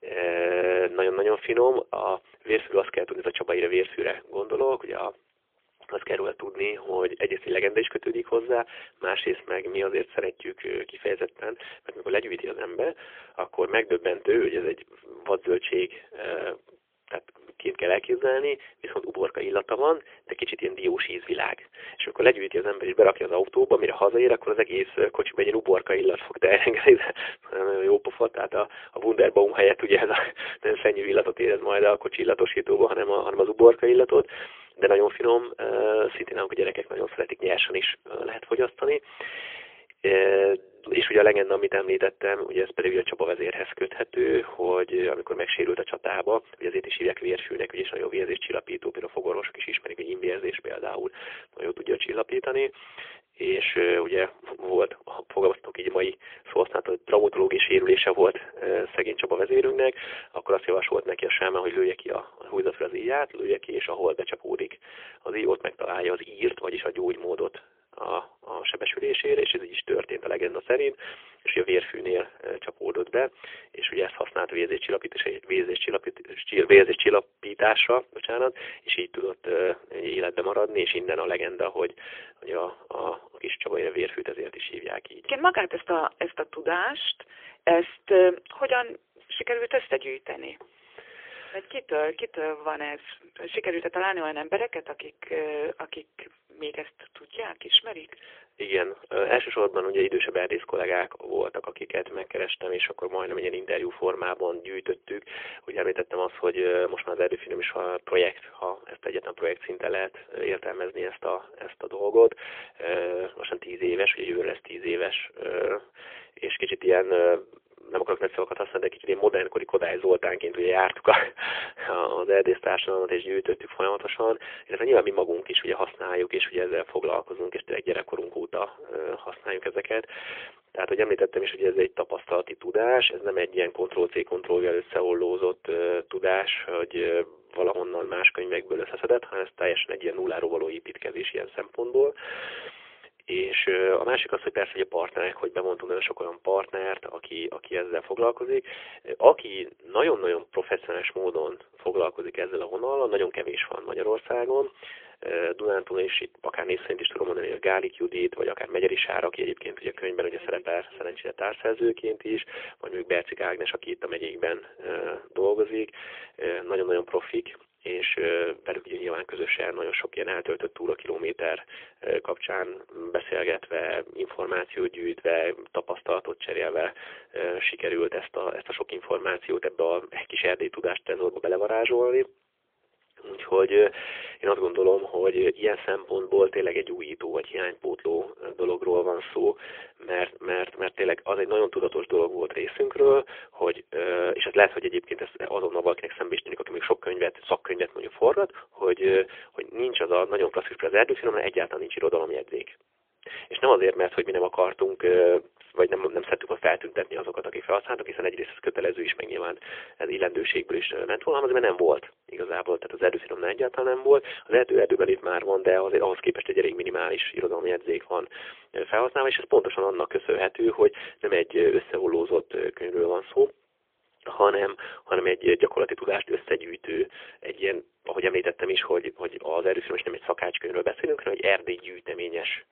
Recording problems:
phone-call audio; poor line; nothing above 3.5 kHz

